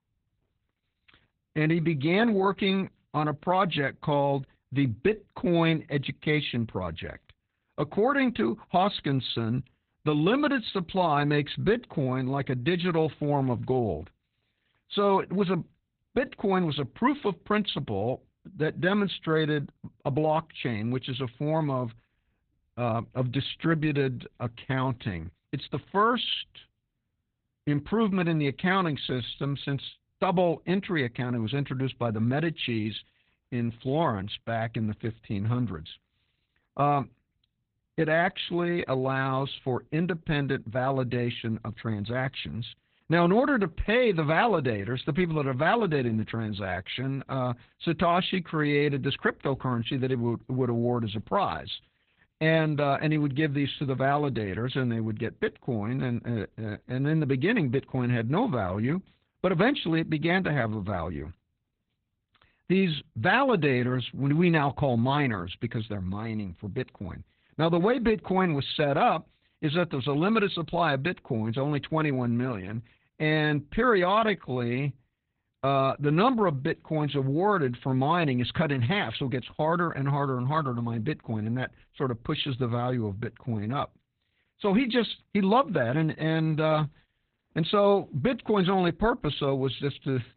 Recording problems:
garbled, watery; badly; nothing above 4 kHz

